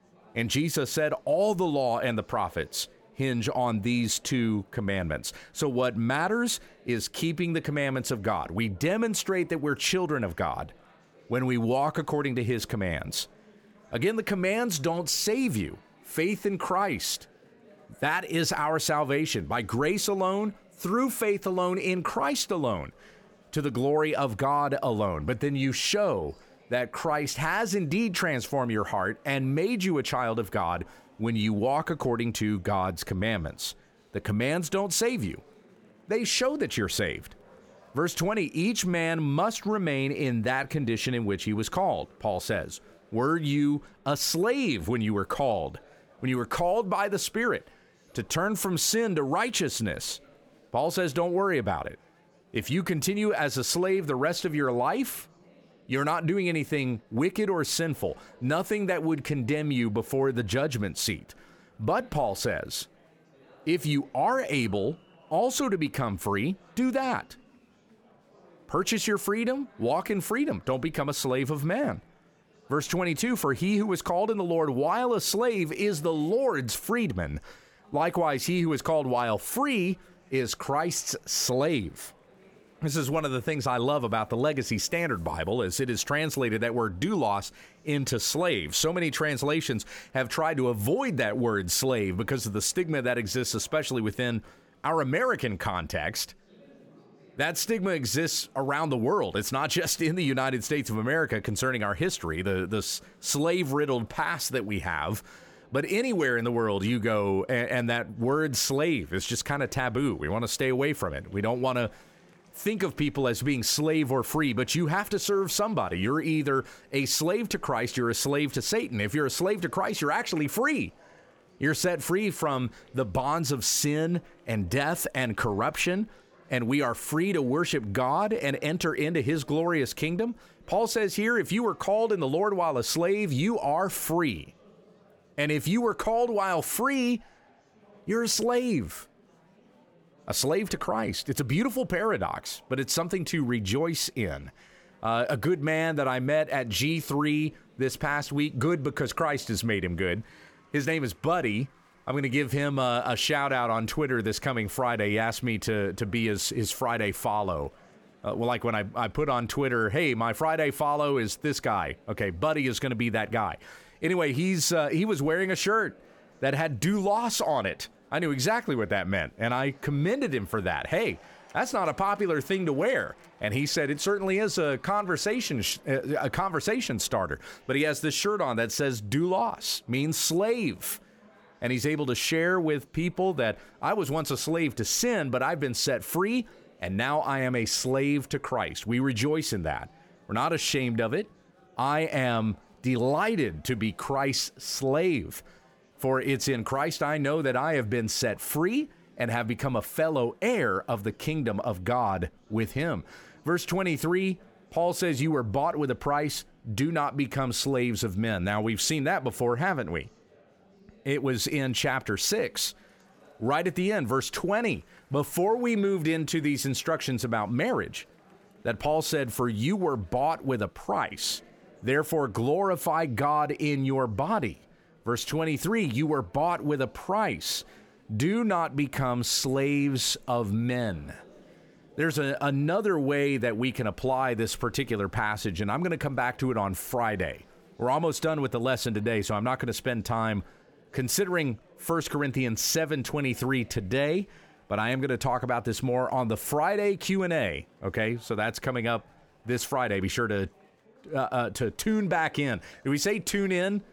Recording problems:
murmuring crowd; faint; throughout; 30 dB below the speech

